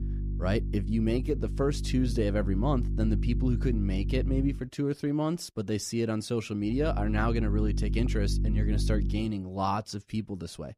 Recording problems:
electrical hum; noticeable; until 4.5 s and from 6.5 to 9 s; 50 Hz, 10 dB below the speech

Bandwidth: 15 kHz